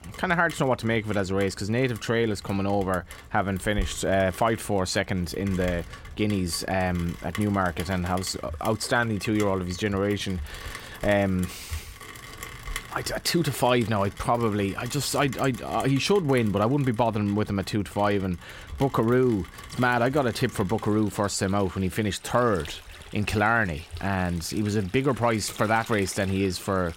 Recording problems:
rain or running water; noticeable; throughout; 20 dB below the speech

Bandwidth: 16 kHz